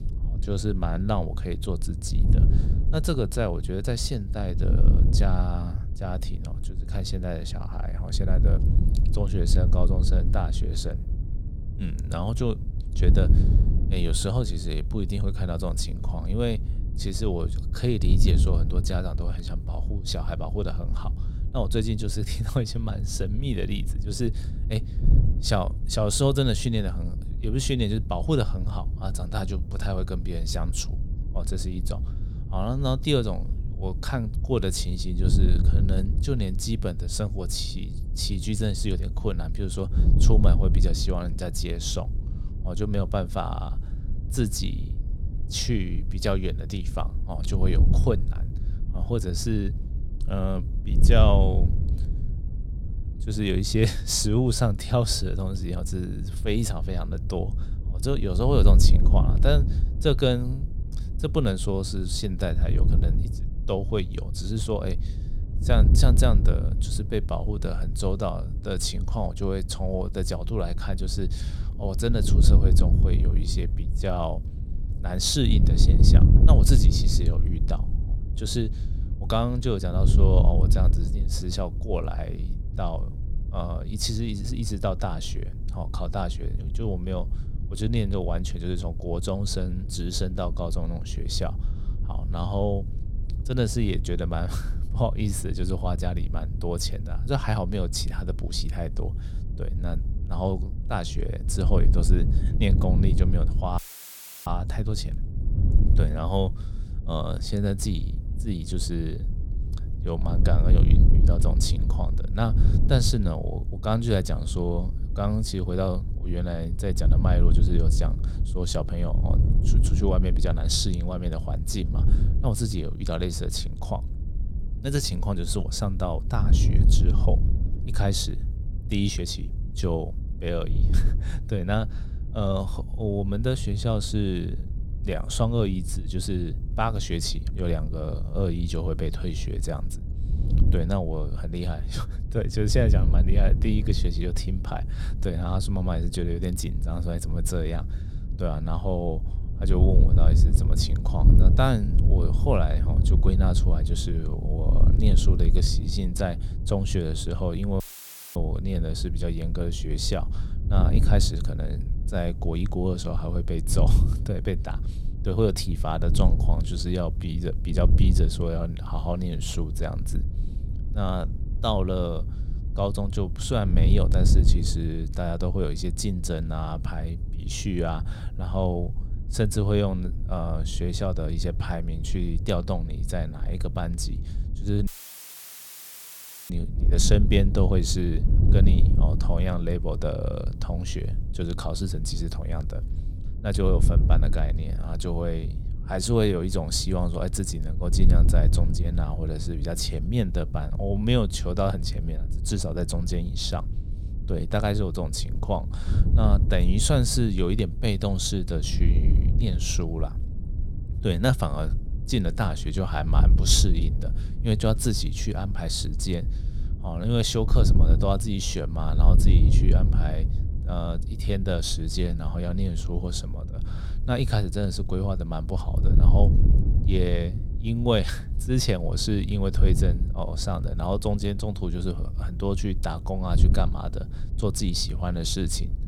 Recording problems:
wind noise on the microphone; occasional gusts; 10 dB below the speech
audio cutting out; filled with static; at 1:44 for 0.5 s, at 2:38 for 0.5 s and at 3:05 for 1.5 s

